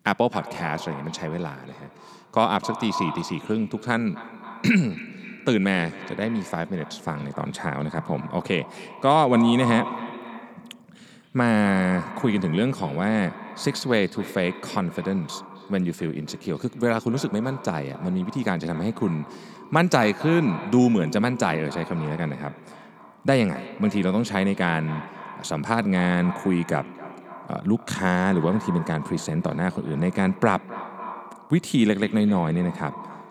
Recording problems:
echo of what is said; noticeable; throughout; 260 ms later, 15 dB below the speech

